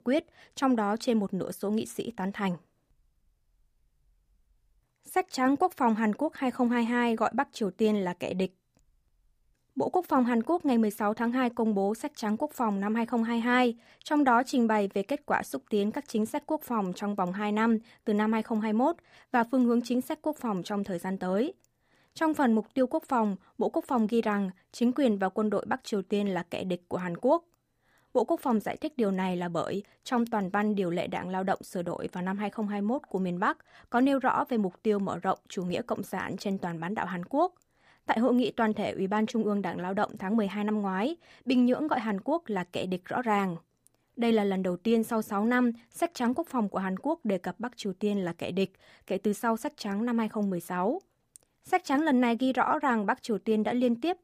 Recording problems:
none

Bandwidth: 15 kHz